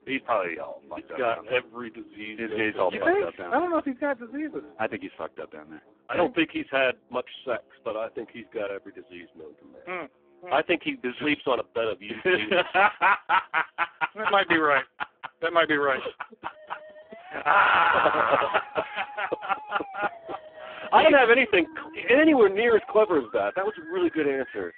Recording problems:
phone-call audio; poor line
background music; faint; throughout; 25 dB below the speech

